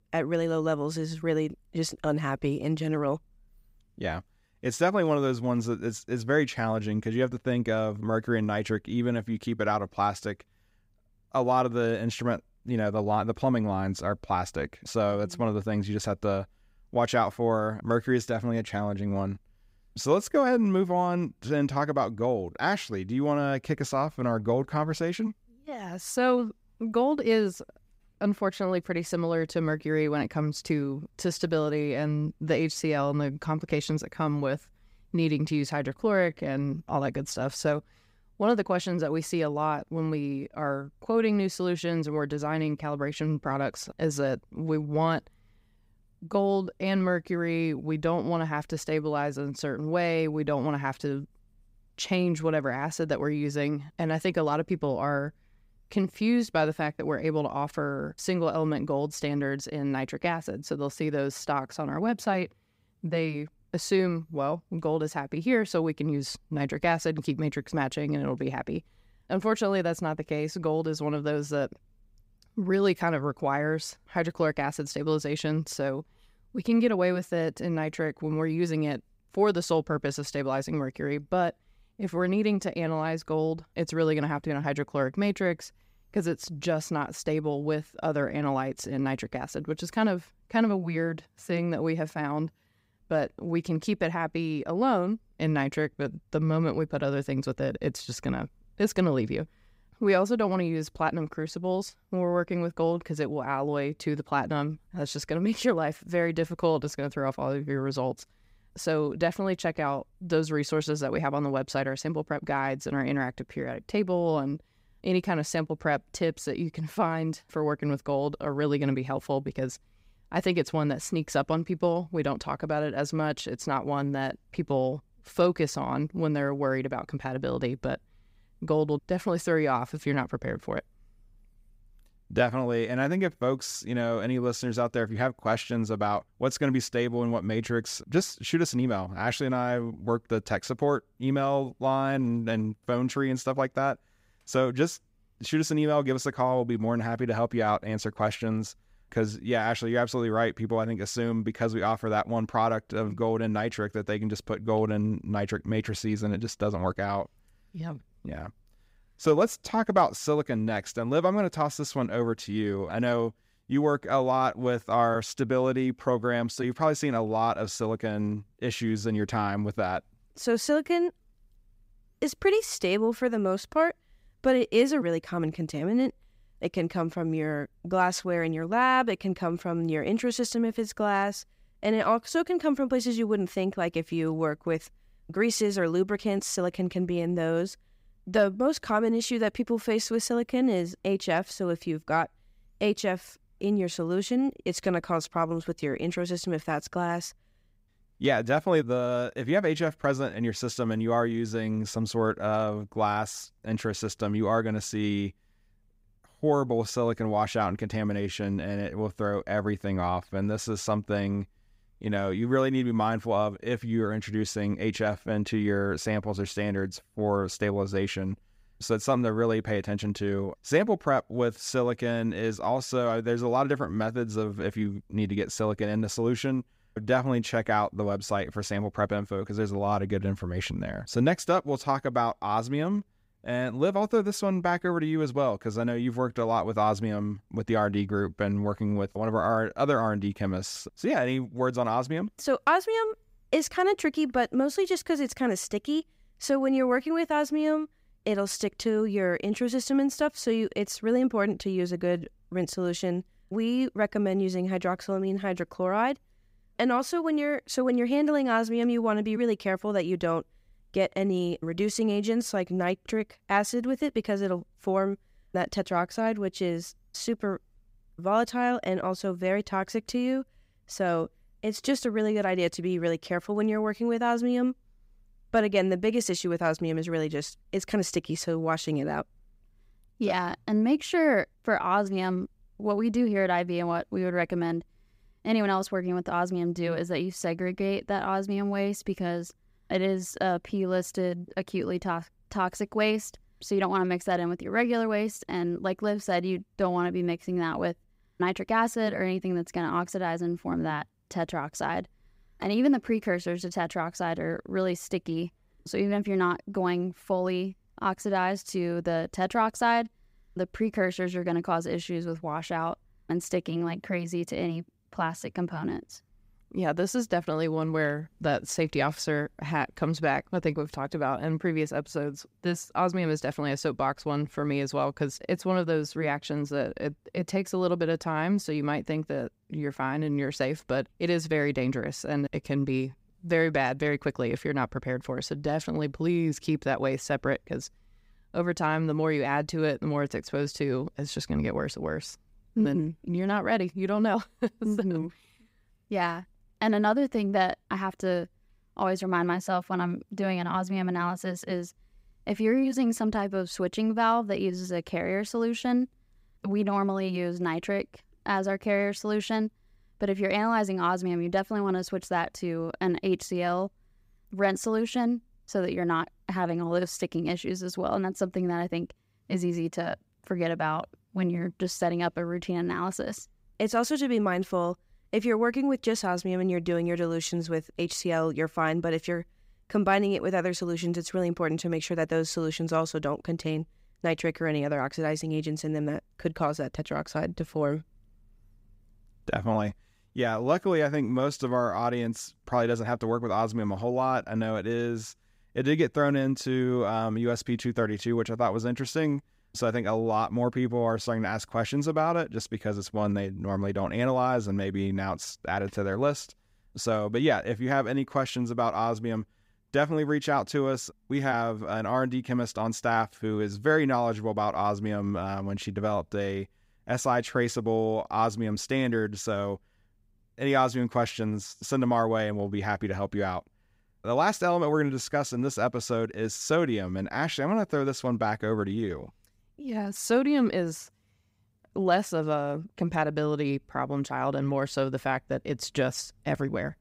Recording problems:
none

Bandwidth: 15.5 kHz